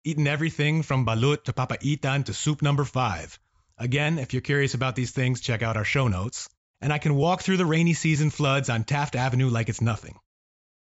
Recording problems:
high frequencies cut off; noticeable; nothing above 8 kHz

